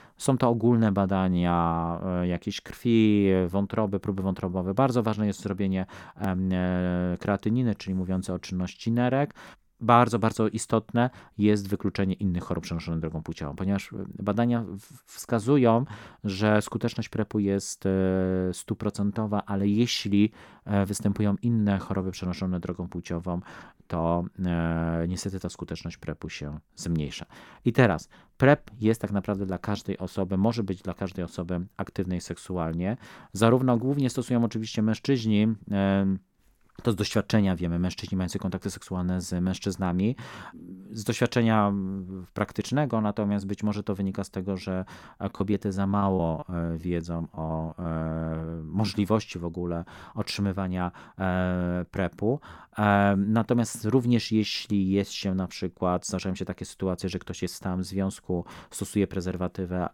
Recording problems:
choppy; very; from 45 to 48 s; 16% of the speech affected

